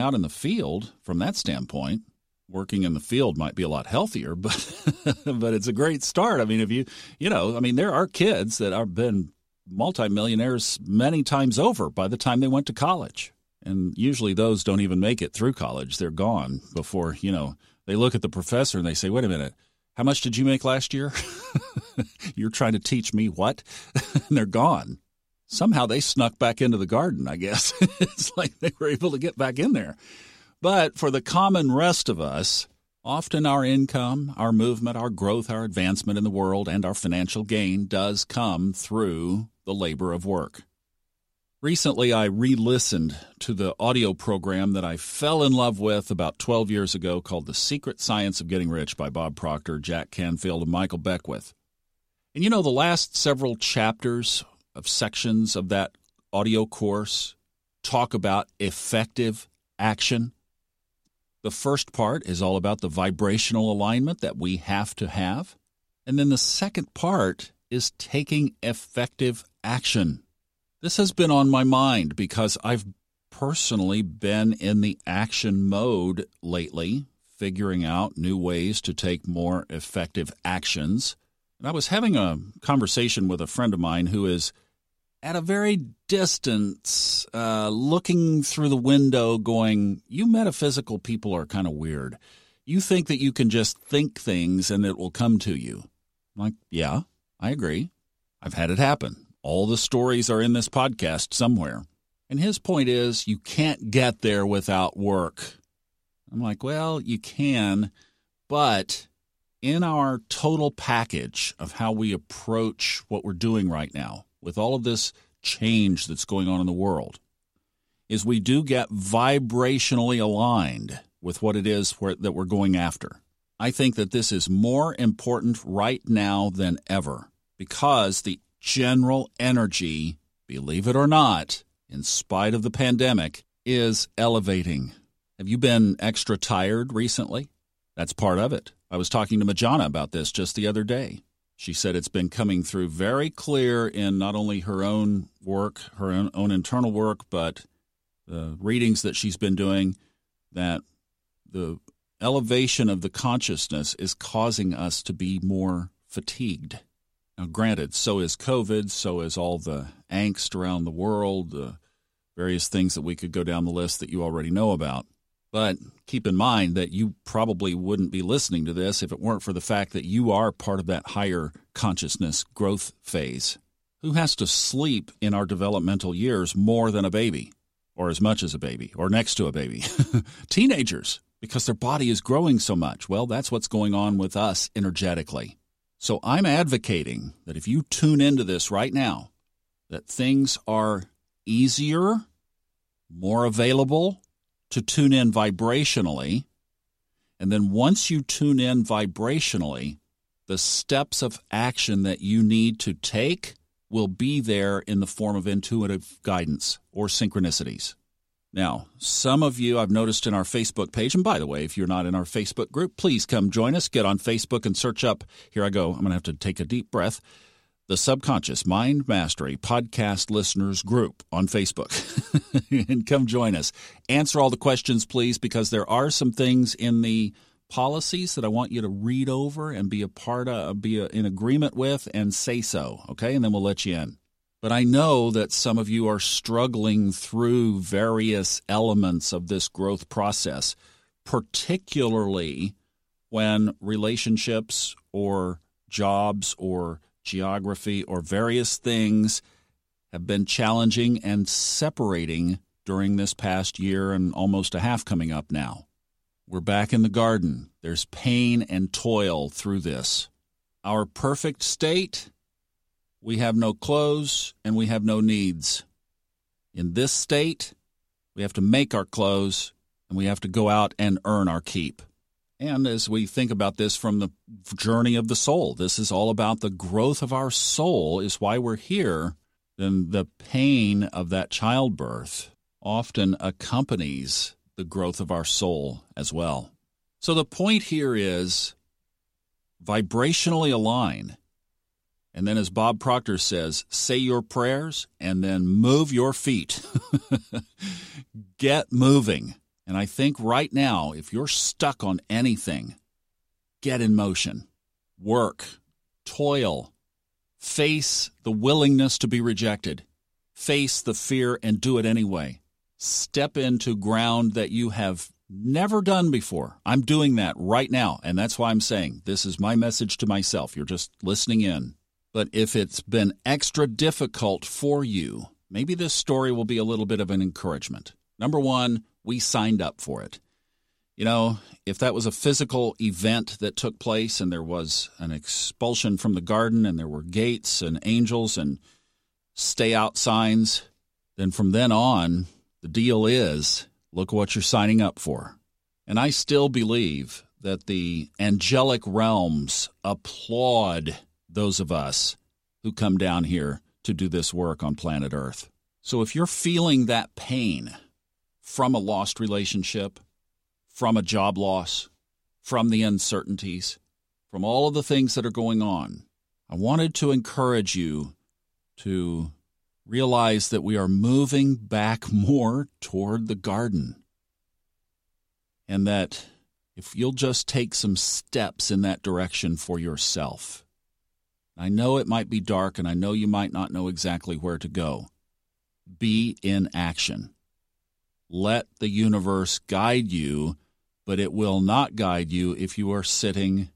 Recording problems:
abrupt cut into speech; at the start

